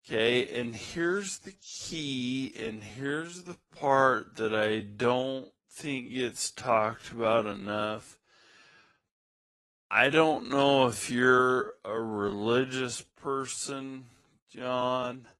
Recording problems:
wrong speed, natural pitch; too slow; 0.5 times normal speed
garbled, watery; slightly; nothing above 11 kHz

